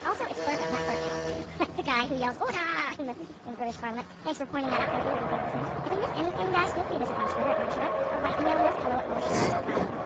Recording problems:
garbled, watery; badly; nothing above 7.5 kHz
wrong speed and pitch; too fast and too high; 1.5 times normal speed
traffic noise; very loud; throughout; as loud as the speech
alarm; loud; until 1.5 s; peak 1 dB above the speech
uneven, jittery; strongly; from 0.5 to 9.5 s
clattering dishes; loud; at 9.5 s; peak 3 dB above the speech

